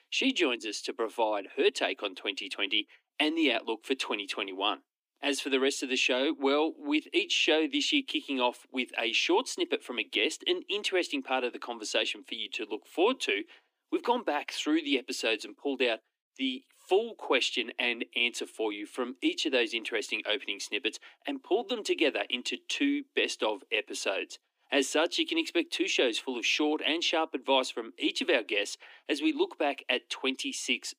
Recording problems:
thin; very slightly; fading below 250 Hz

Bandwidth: 15 kHz